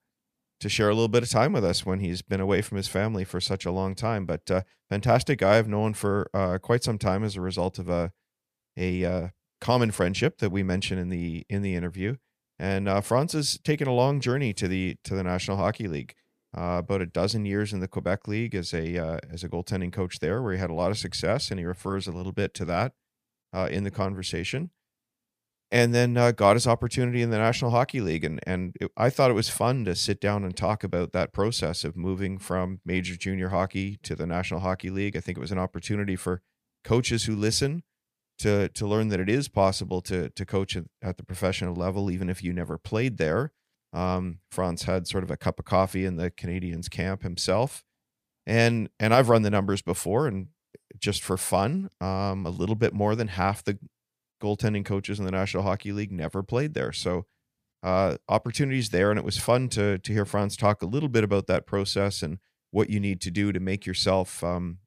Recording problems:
none

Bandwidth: 15 kHz